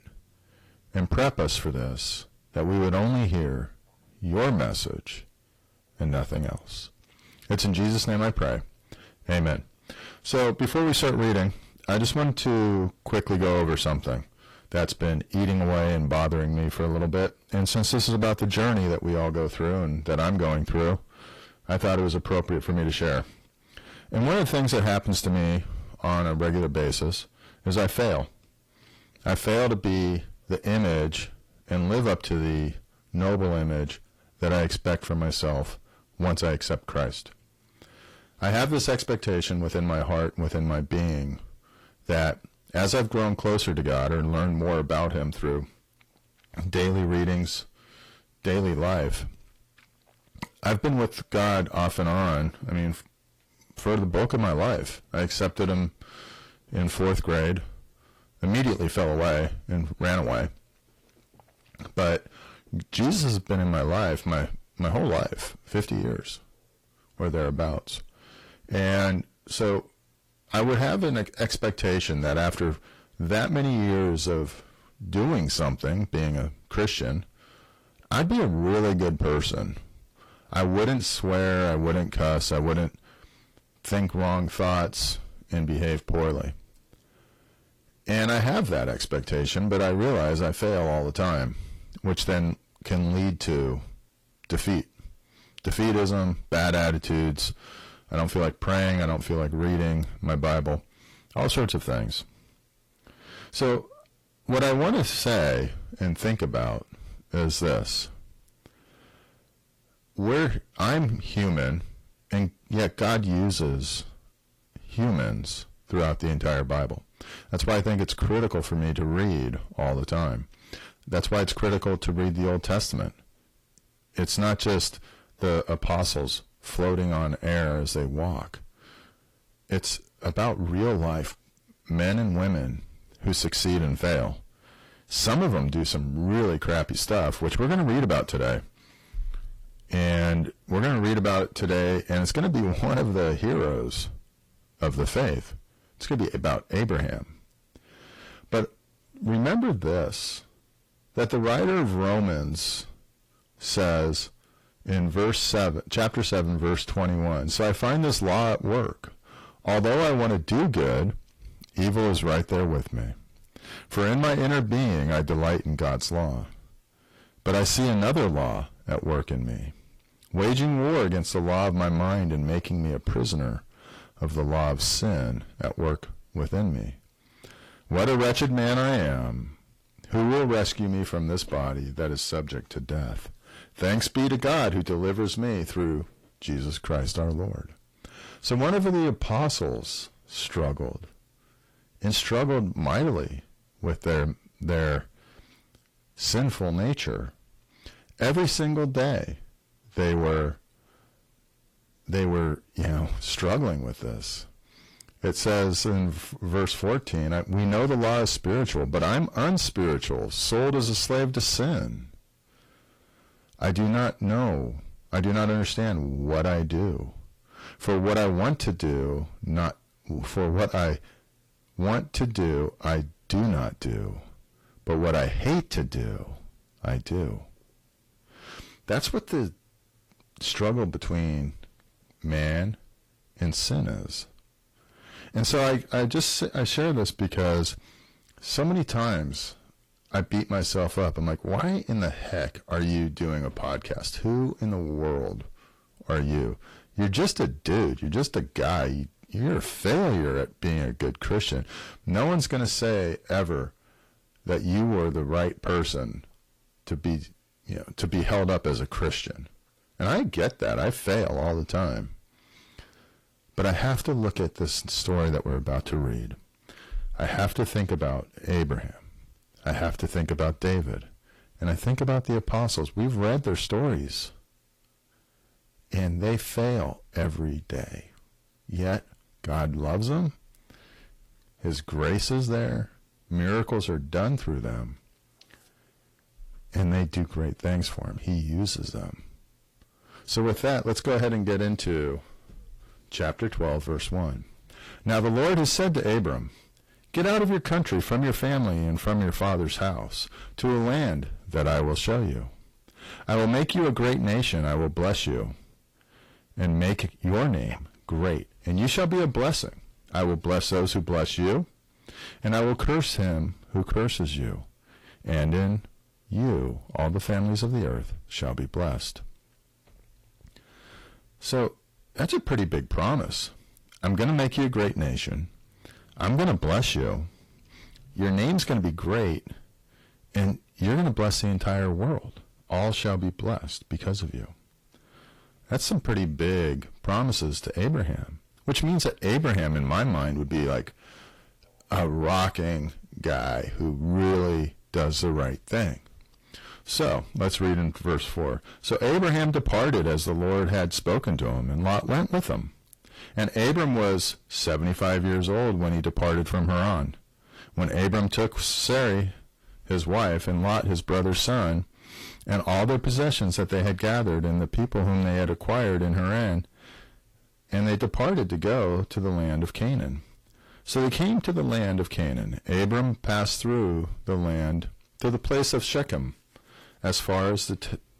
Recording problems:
distortion; heavy; 6 dB below the speech
garbled, watery; slightly

